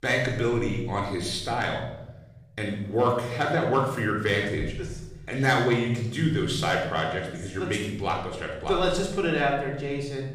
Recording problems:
off-mic speech; far
room echo; noticeable; dies away in 1 s

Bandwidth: 15 kHz